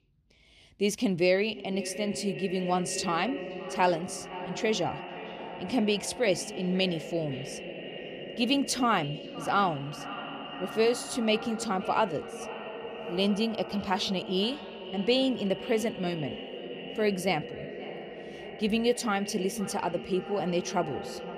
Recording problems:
echo of what is said; strong; throughout; 520 ms later, 10 dB below the speech

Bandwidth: 15 kHz